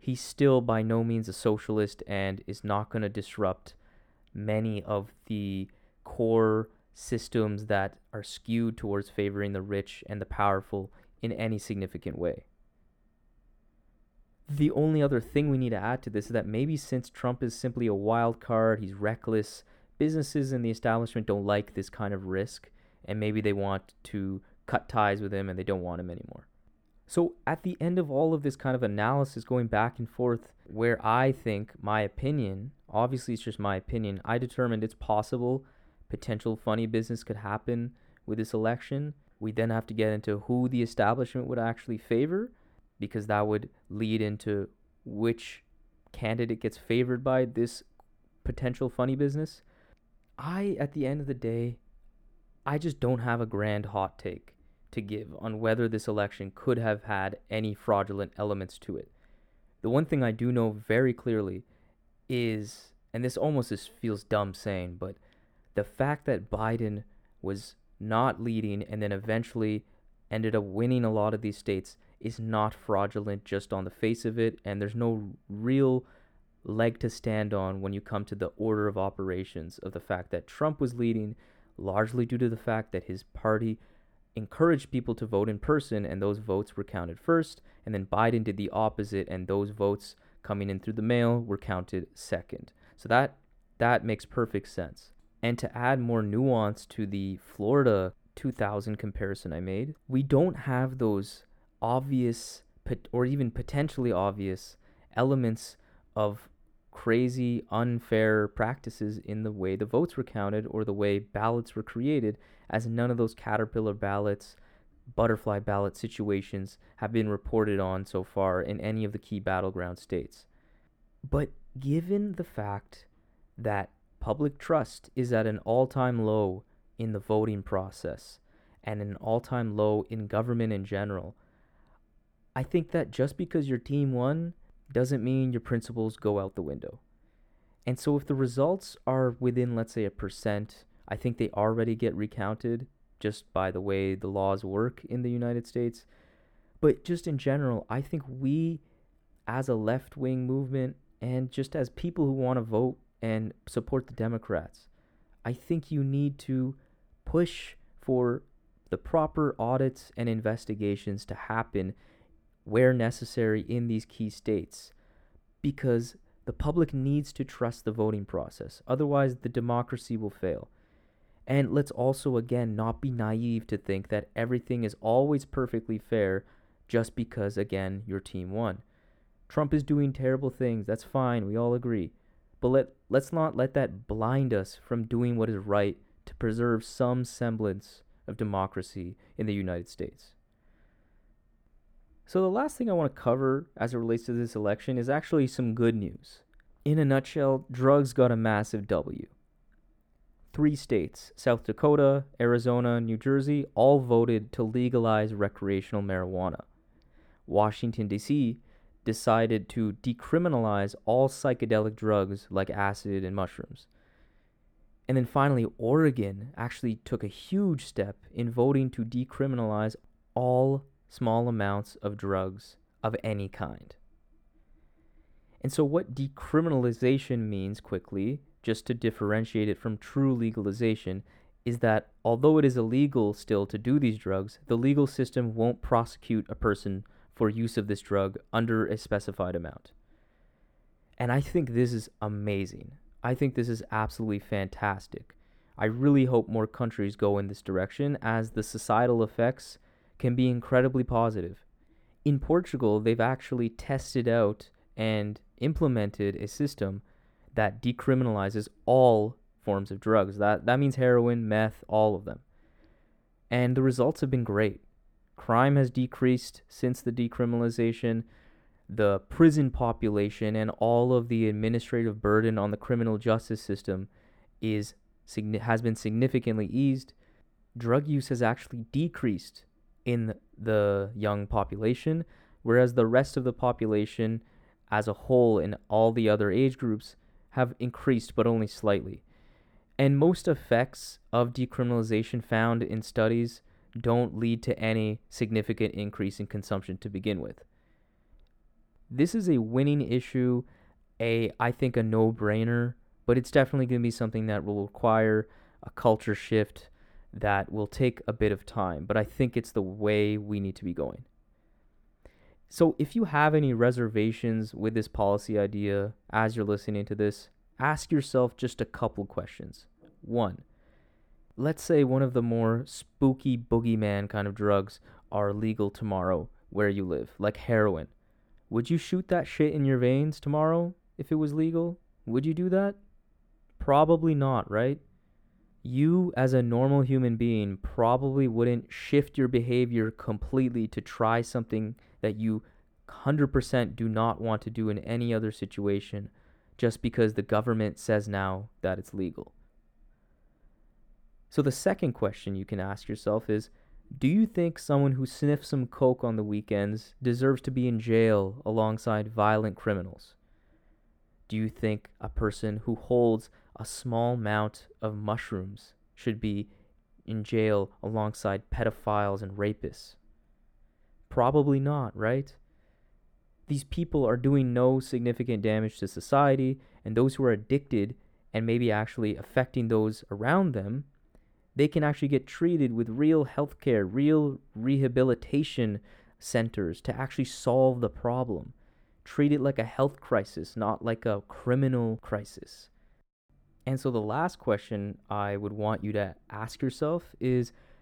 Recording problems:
muffled; slightly; fading above 2.5 kHz

